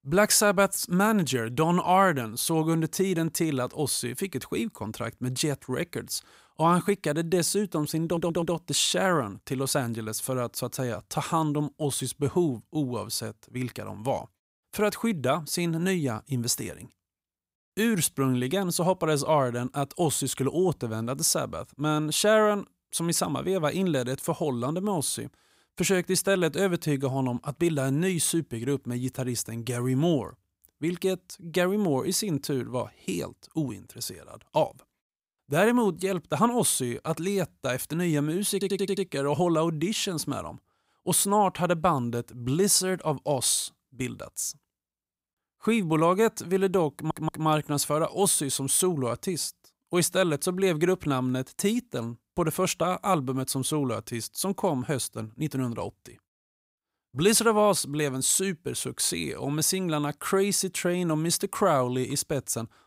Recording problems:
audio stuttering; at 8 s, at 39 s and at 47 s

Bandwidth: 15.5 kHz